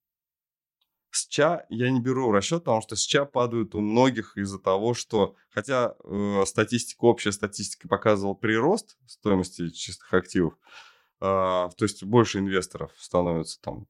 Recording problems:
none

